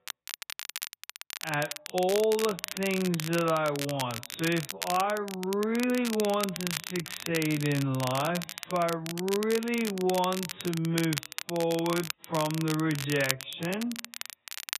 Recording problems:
garbled, watery; badly; nothing above 4 kHz
wrong speed, natural pitch; too slow; 0.5 times normal speed
crackle, like an old record; loud; 7 dB below the speech

